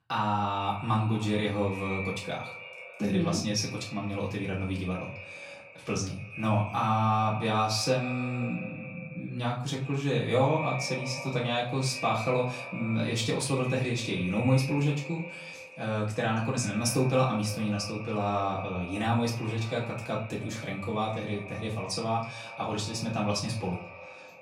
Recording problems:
echo of what is said; strong; throughout; 140 ms later, 10 dB below the speech
off-mic speech; far
room echo; slight; dies away in 0.3 s

